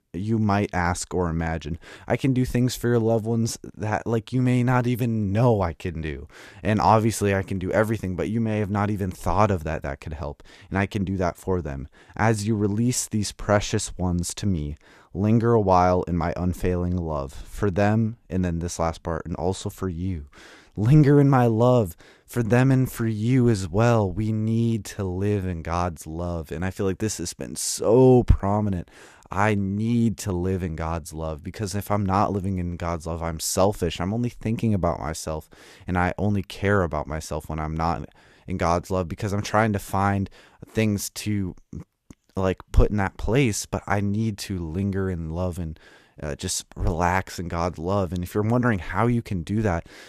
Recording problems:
none

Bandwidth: 14.5 kHz